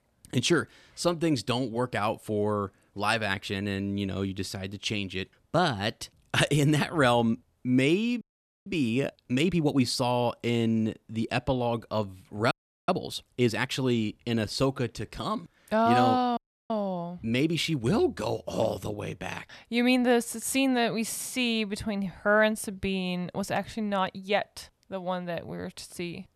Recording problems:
audio freezing; at 8 s, at 13 s and at 16 s

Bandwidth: 13.5 kHz